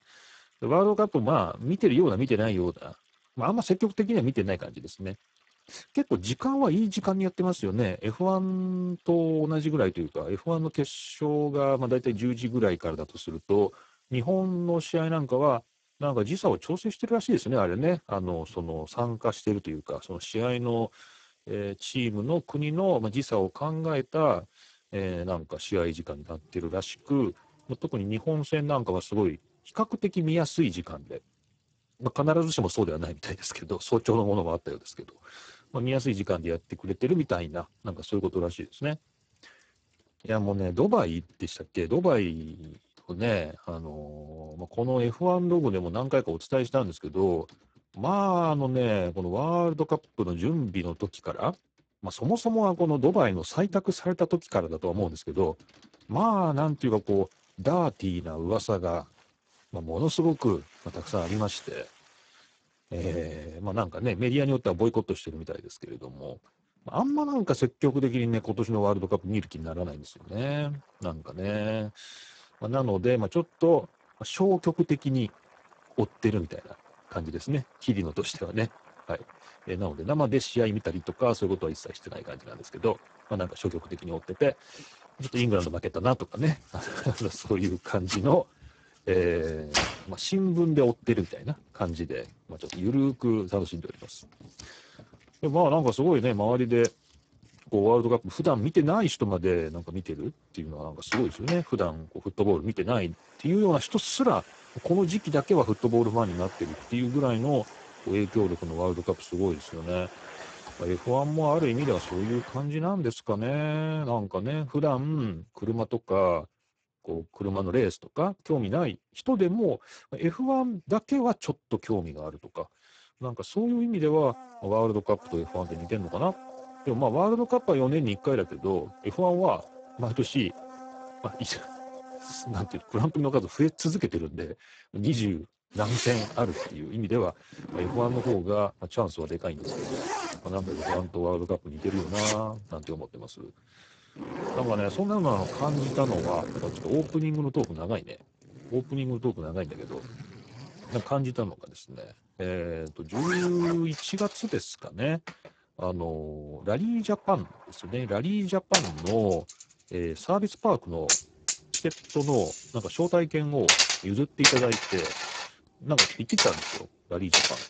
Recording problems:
garbled, watery; badly; nothing above 8 kHz
household noises; loud; throughout; 4 dB below the speech

